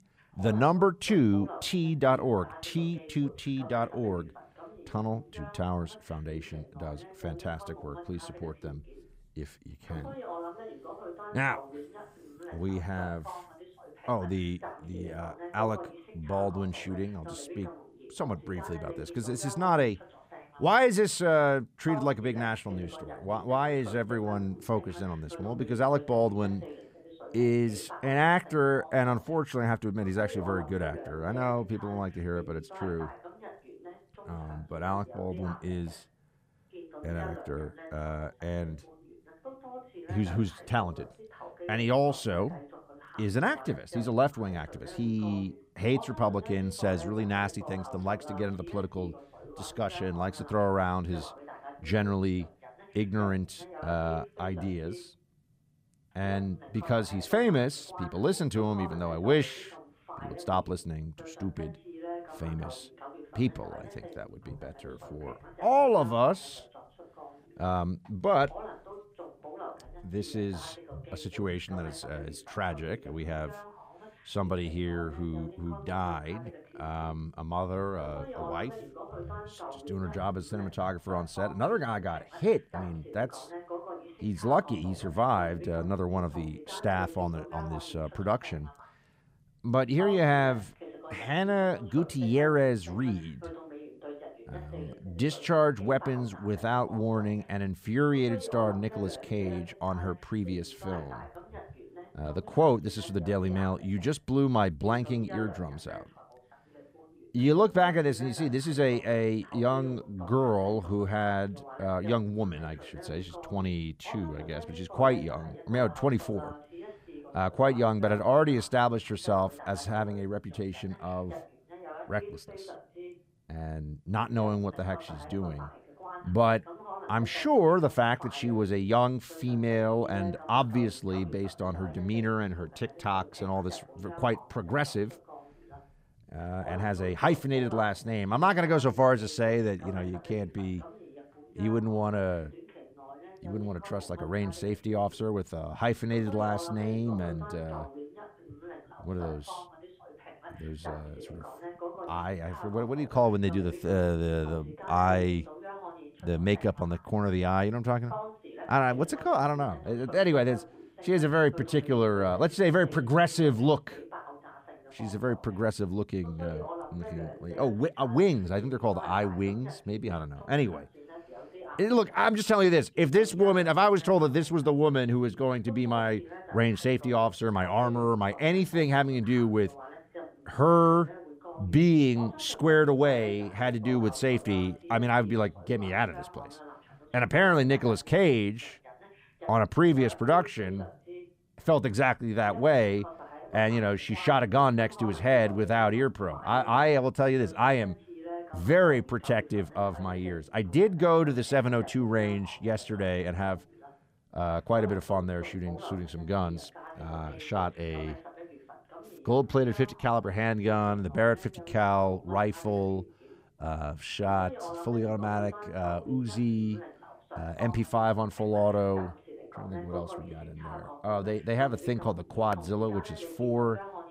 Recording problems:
voice in the background; noticeable; throughout; 15 dB below the speech

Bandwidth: 15.5 kHz